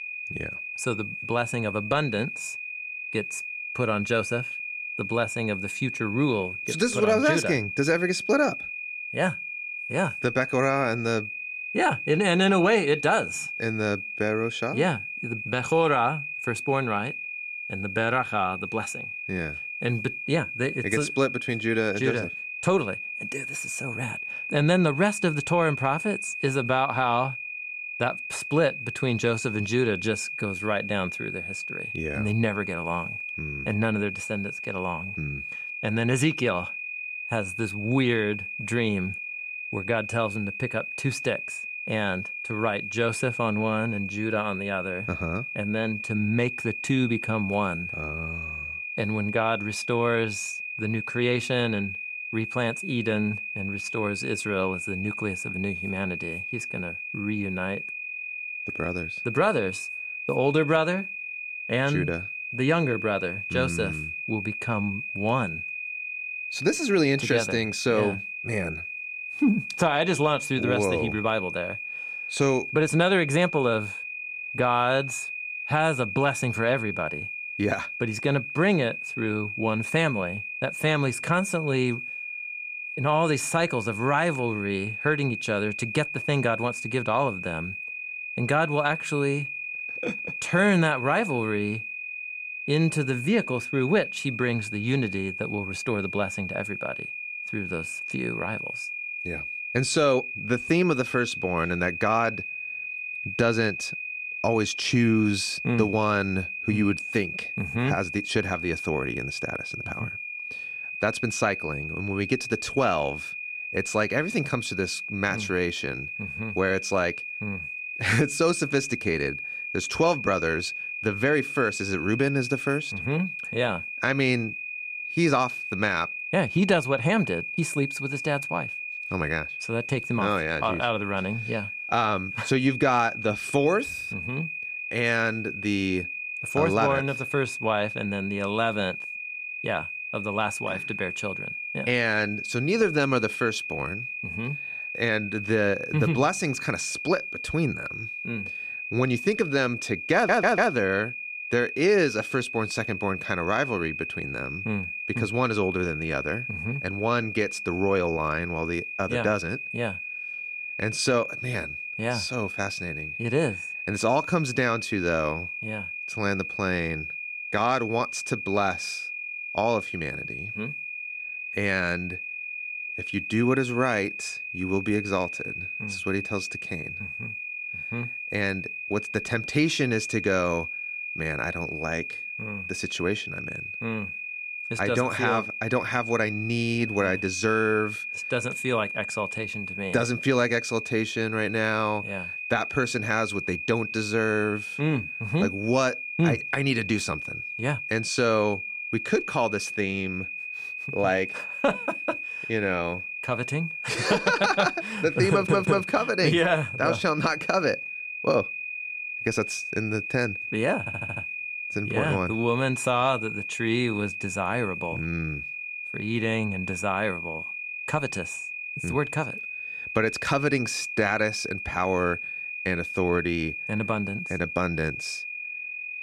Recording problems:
high-pitched whine; loud; throughout; 2.5 kHz, 5 dB below the speech
audio stuttering; at 2:30, at 3:25 and at 3:31

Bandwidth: 15 kHz